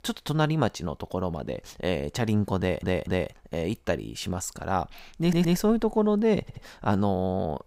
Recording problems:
audio stuttering; at 2.5 s, at 5 s and at 6.5 s

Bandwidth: 15.5 kHz